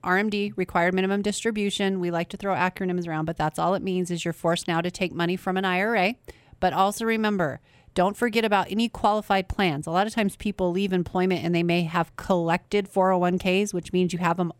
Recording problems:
none

